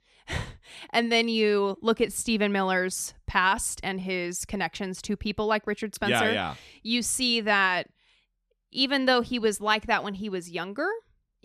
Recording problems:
none

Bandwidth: 14 kHz